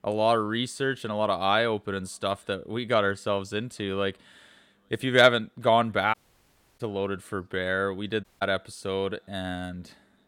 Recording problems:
audio cutting out; at 6 s for 0.5 s and at 8 s

